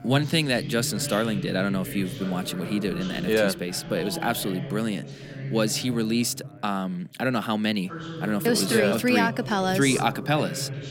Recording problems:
background chatter; noticeable; throughout; 3 voices, 10 dB below the speech

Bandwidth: 16.5 kHz